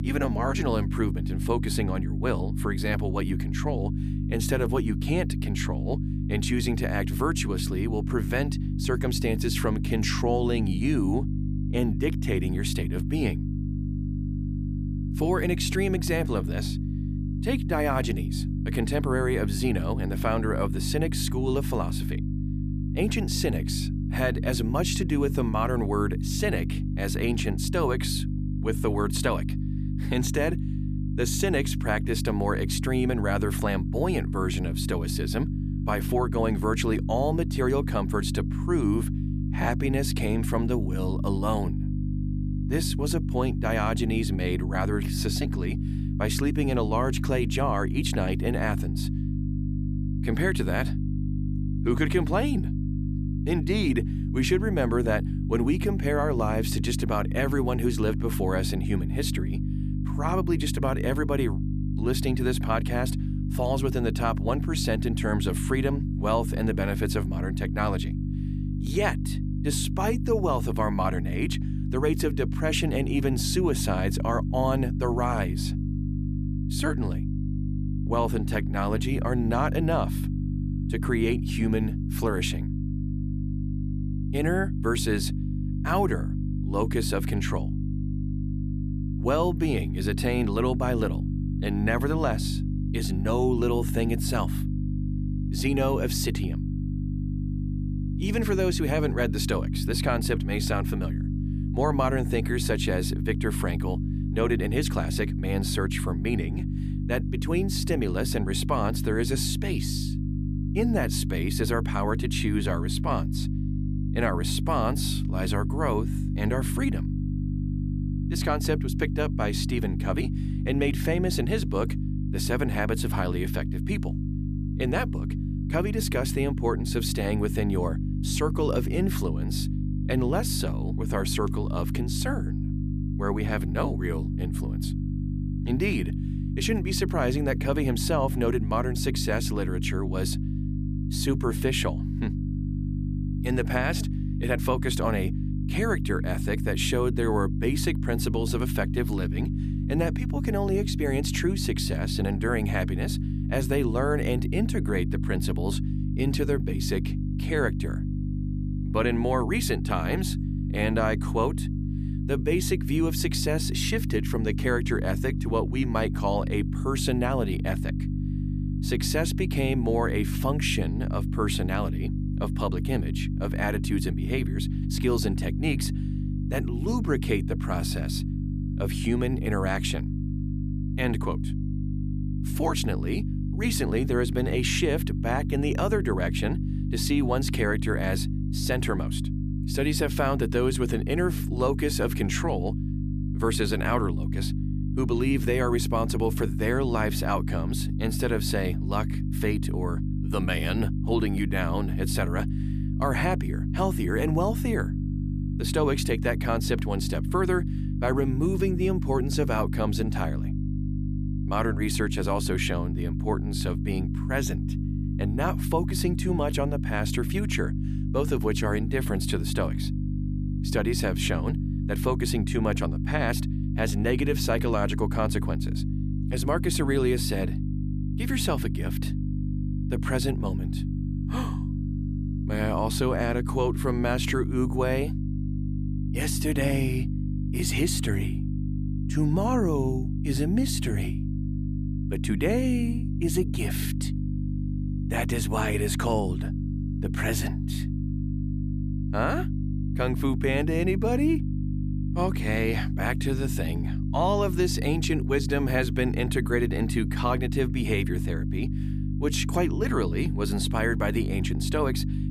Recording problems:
electrical hum; loud; throughout; 50 Hz, 9 dB below the speech

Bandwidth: 14.5 kHz